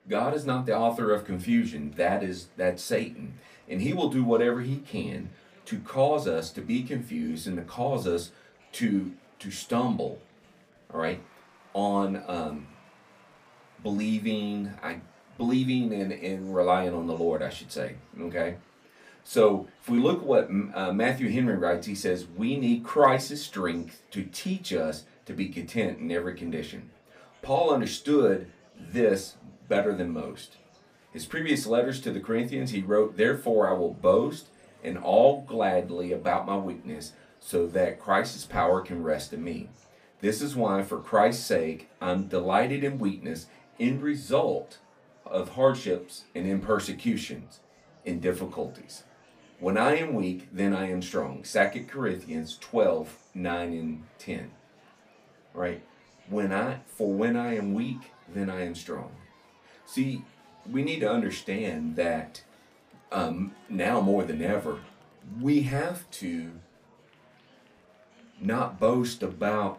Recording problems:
off-mic speech; far
room echo; very slight; dies away in 0.2 s
murmuring crowd; faint; throughout; 30 dB below the speech

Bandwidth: 15 kHz